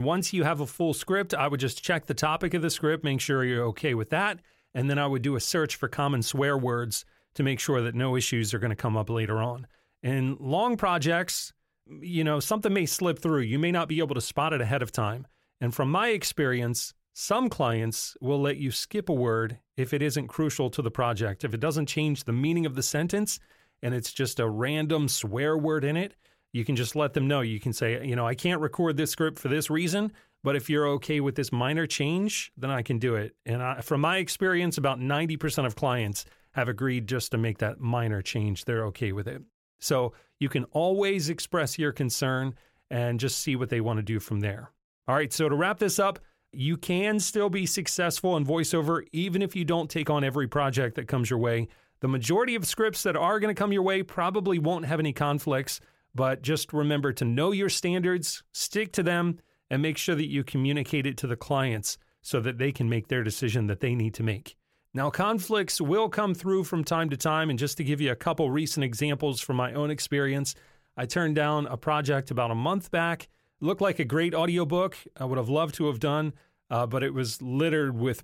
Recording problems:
abrupt cut into speech; at the start

